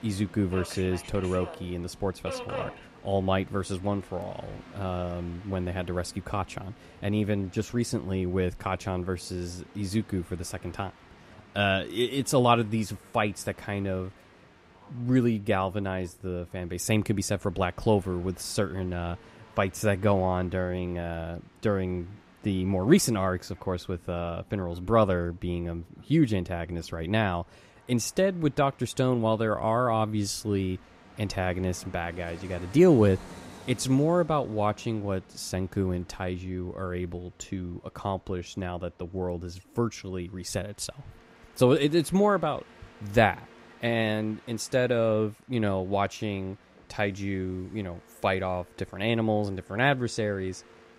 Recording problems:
train or aircraft noise; faint; throughout; 20 dB below the speech

